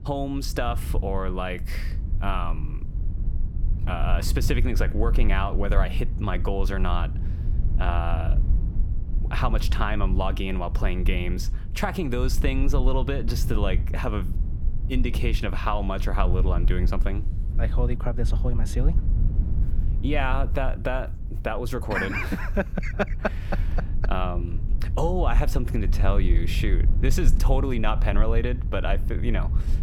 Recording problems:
low rumble; noticeable; throughout; 15 dB below the speech

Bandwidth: 17 kHz